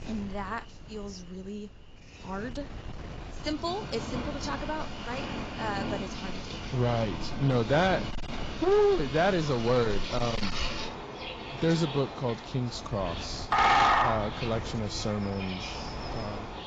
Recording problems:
garbled, watery; badly; nothing above 7.5 kHz
distortion; slight; 4% of the sound clipped
animal sounds; loud; throughout; 3 dB below the speech
wind noise on the microphone; occasional gusts; 20 dB below the speech

